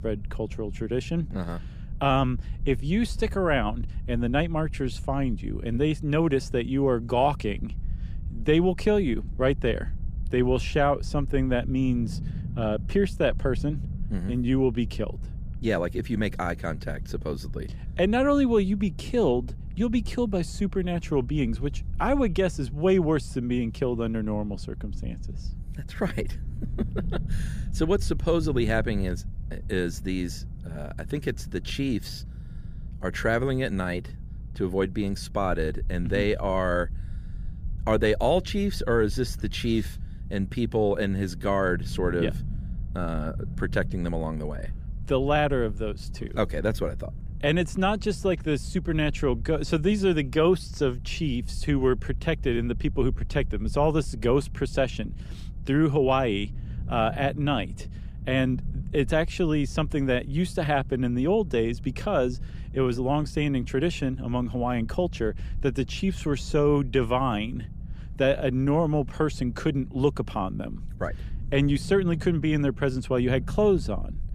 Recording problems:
low rumble; faint; throughout; 25 dB below the speech

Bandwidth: 15 kHz